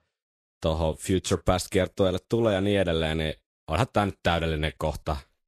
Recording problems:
garbled, watery; slightly; nothing above 12.5 kHz

